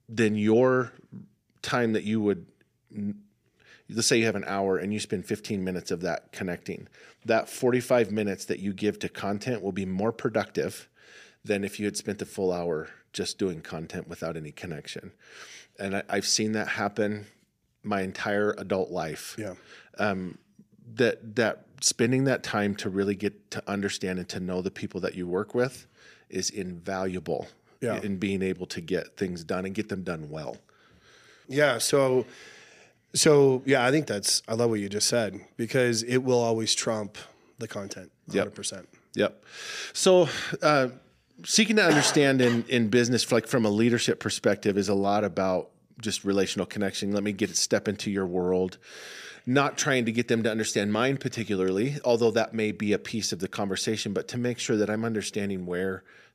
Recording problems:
none

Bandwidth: 15 kHz